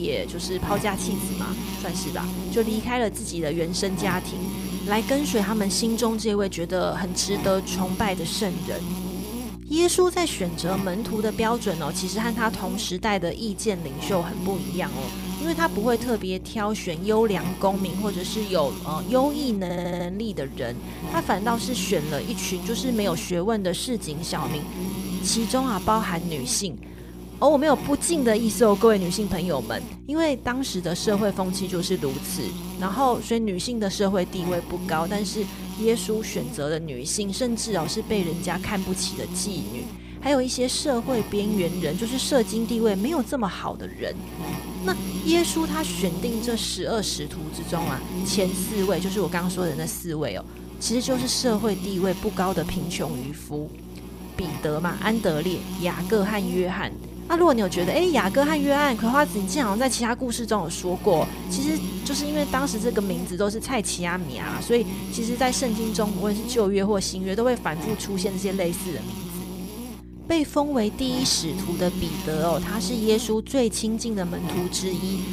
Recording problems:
electrical hum; noticeable; throughout; 60 Hz, 10 dB below the speech
abrupt cut into speech; at the start
audio stuttering; at 20 s

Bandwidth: 15 kHz